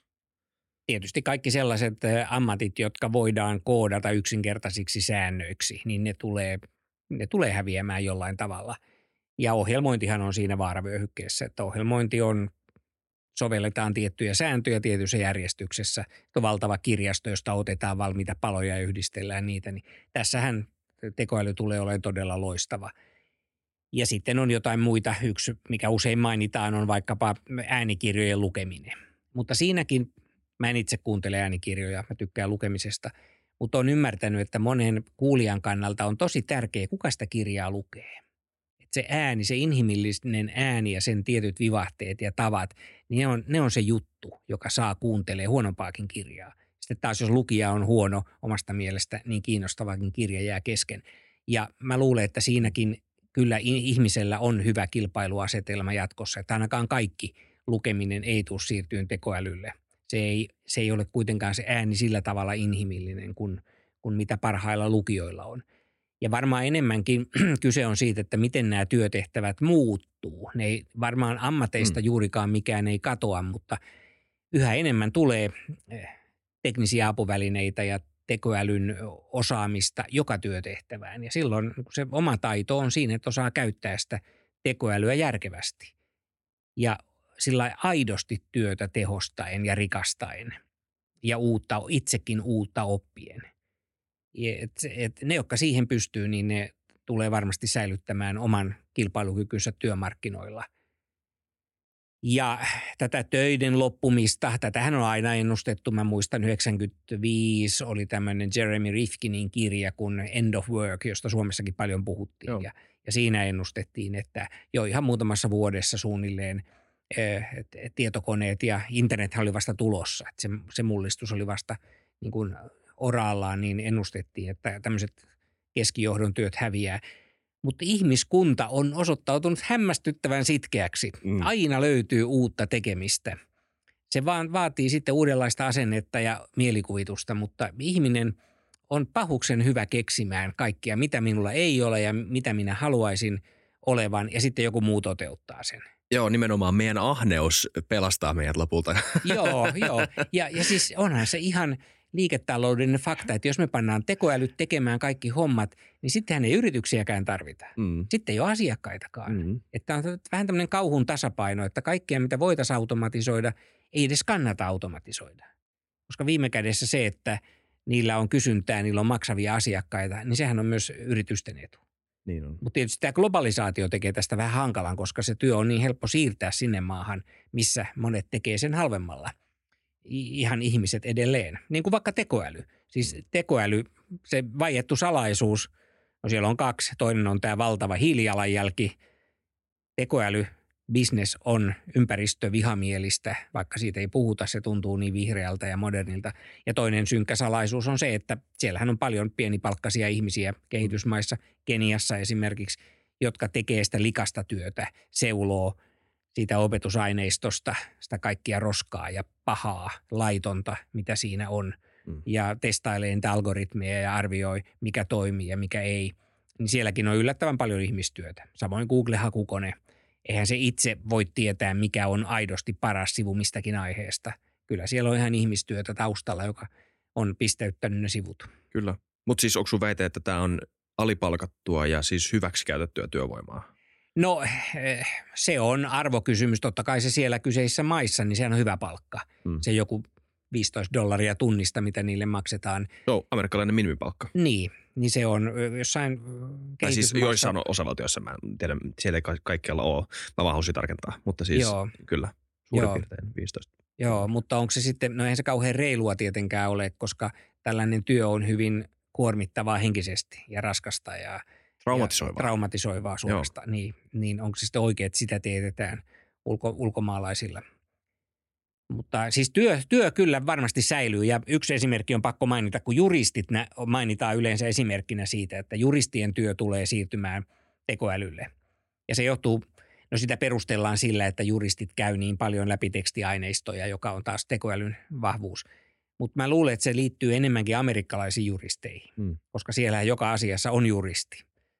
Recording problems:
none

